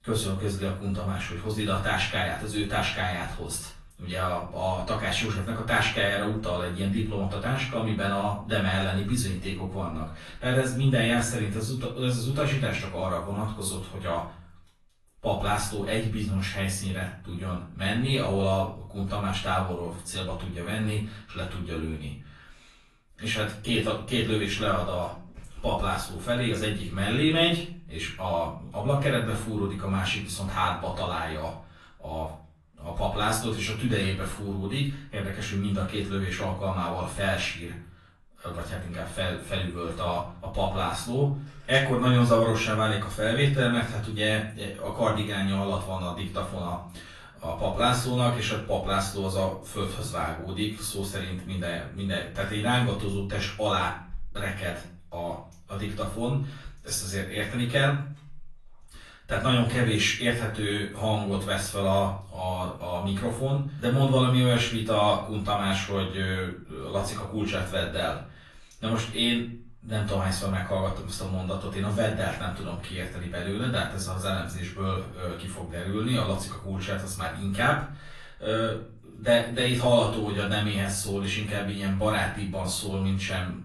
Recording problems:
off-mic speech; far
room echo; slight; dies away in 0.4 s
garbled, watery; slightly; nothing above 11.5 kHz

